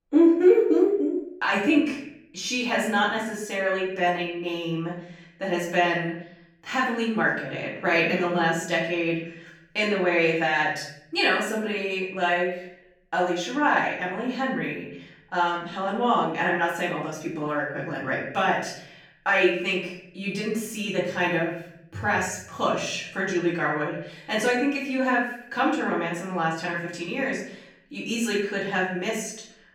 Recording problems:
off-mic speech; far
room echo; noticeable; dies away in 0.7 s

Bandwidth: 18 kHz